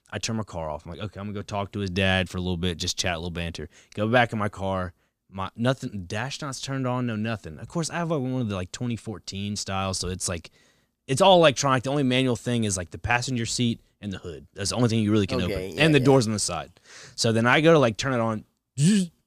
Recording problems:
none

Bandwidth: 15 kHz